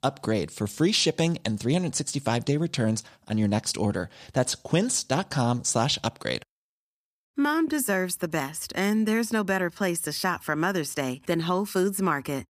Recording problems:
none

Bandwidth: 15 kHz